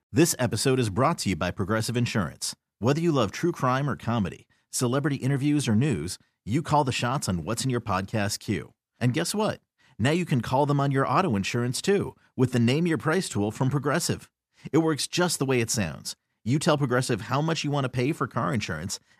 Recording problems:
none

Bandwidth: 14.5 kHz